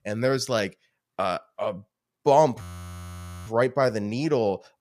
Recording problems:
audio freezing; at 2.5 s for 1 s

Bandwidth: 14.5 kHz